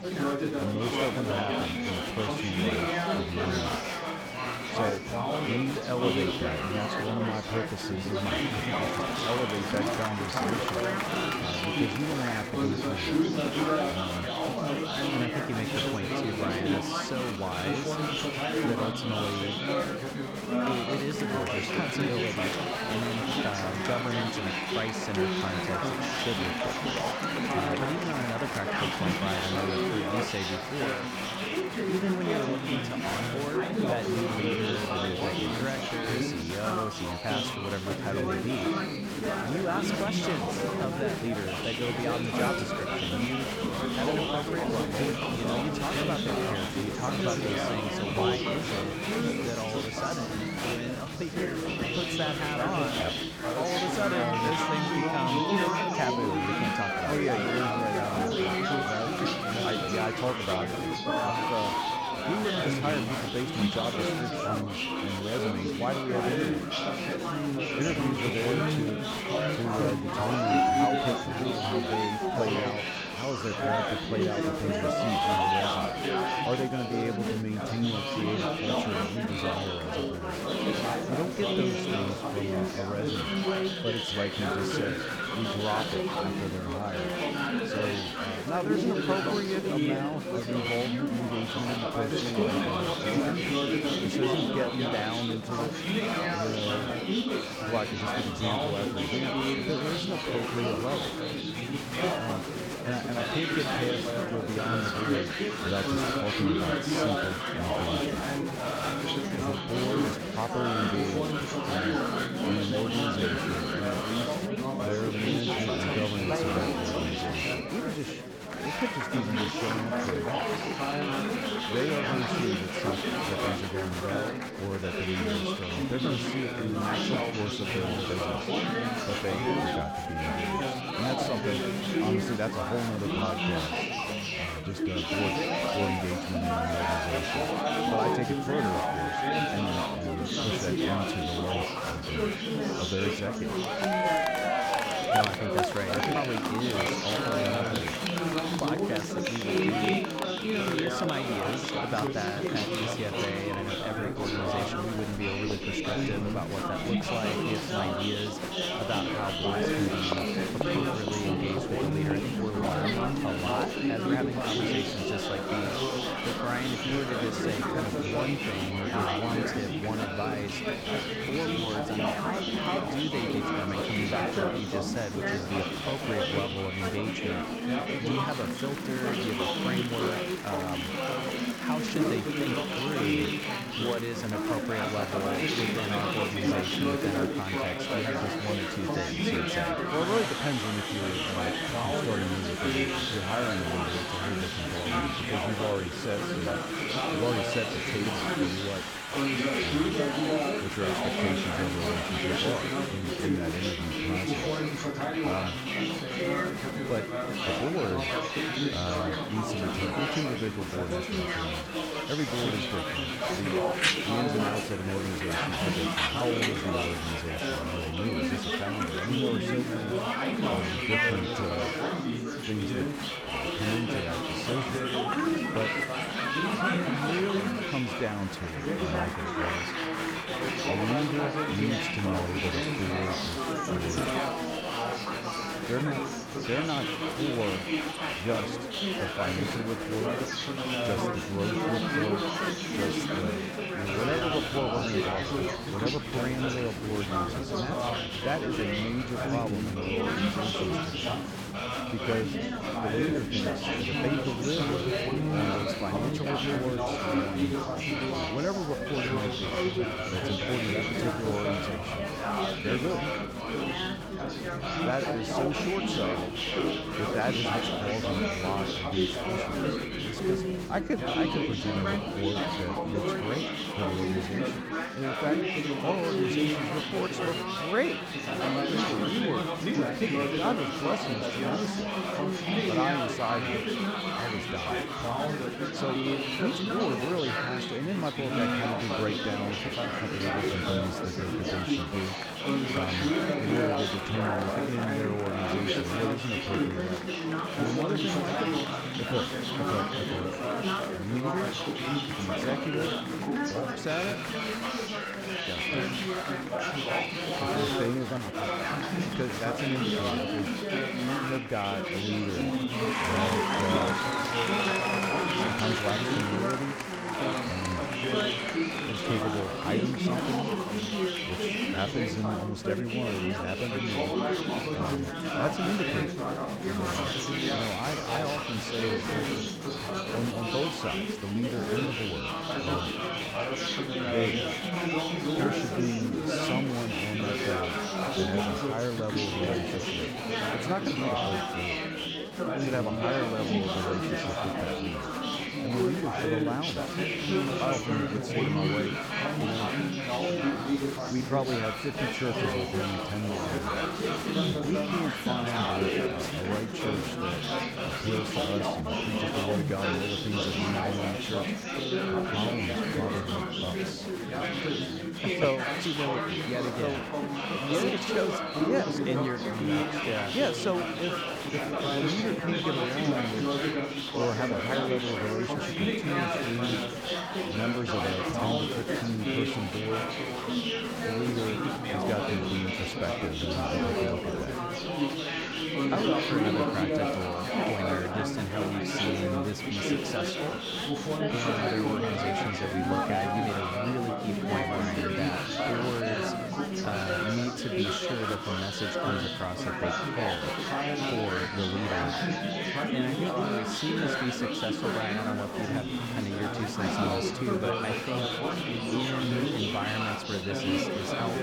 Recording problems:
chatter from many people; very loud; throughout; 4 dB above the speech

